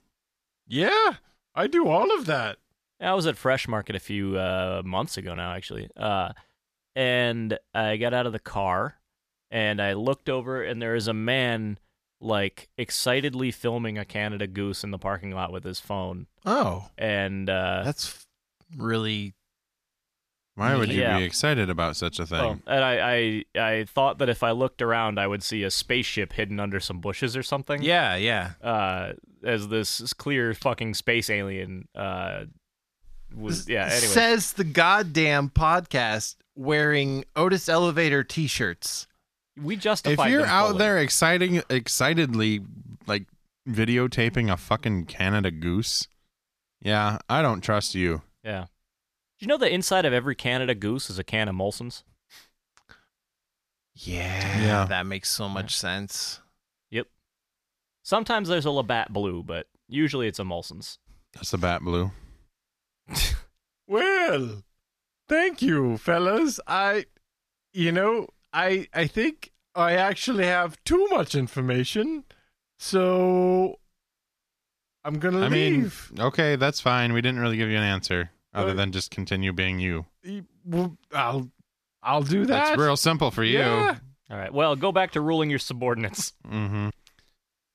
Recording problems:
none

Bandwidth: 14.5 kHz